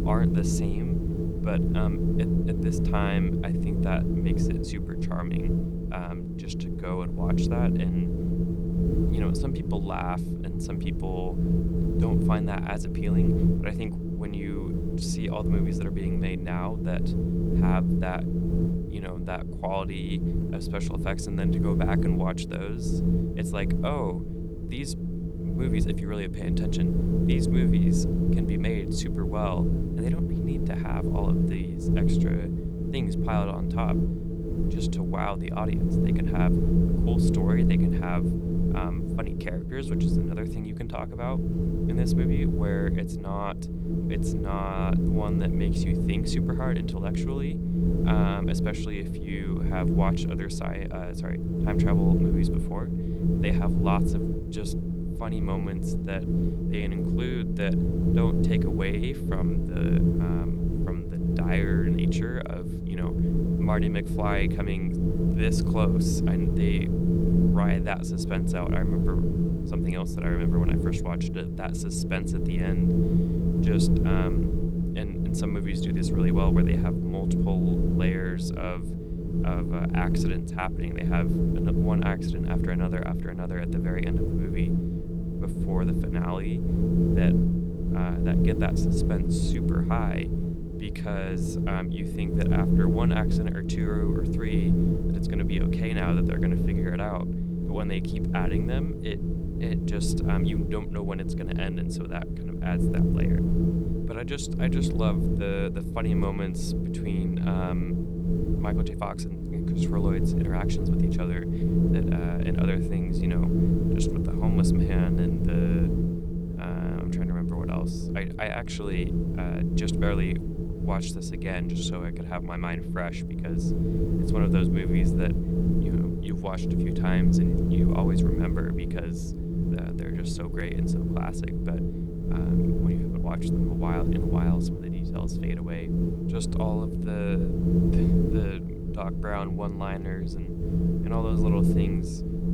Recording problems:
wind noise on the microphone; heavy; 2 dB above the speech

